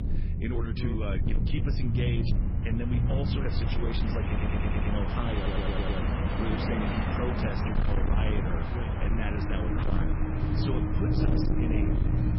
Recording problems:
garbled, watery; badly; nothing above 5.5 kHz
distortion; slight; 11% of the sound clipped
train or aircraft noise; very loud; throughout; 1 dB above the speech
low rumble; loud; throughout; 3 dB below the speech
electrical hum; very faint; throughout; 50 Hz, 25 dB below the speech
audio stuttering; at 4.5 s and at 5.5 s

